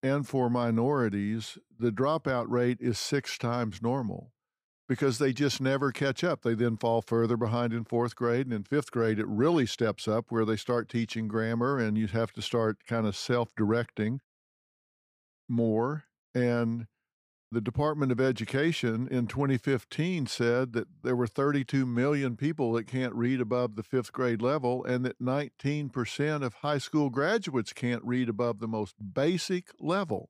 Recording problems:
none

